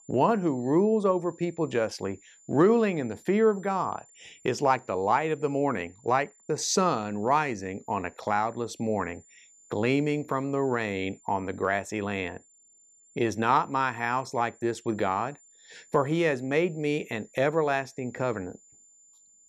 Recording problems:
high-pitched whine; faint; throughout; 7 kHz, 30 dB below the speech

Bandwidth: 14 kHz